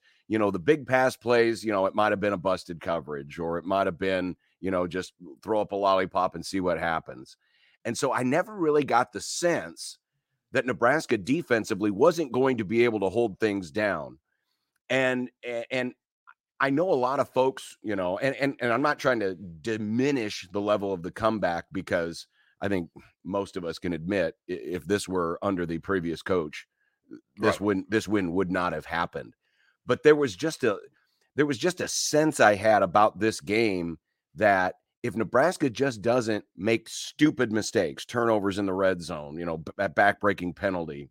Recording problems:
none

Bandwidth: 16 kHz